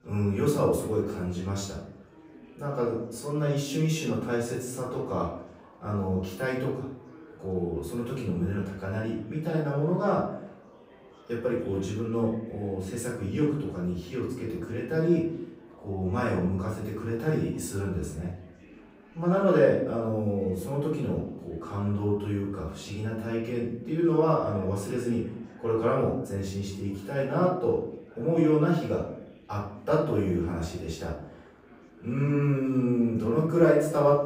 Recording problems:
off-mic speech; far
room echo; noticeable; dies away in 0.7 s
chatter from many people; faint; throughout; 25 dB below the speech

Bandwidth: 15.5 kHz